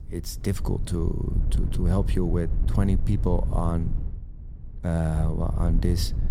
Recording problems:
wind noise on the microphone; occasional gusts; 10 dB below the speech

